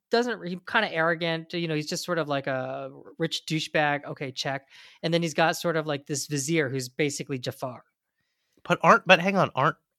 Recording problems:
none

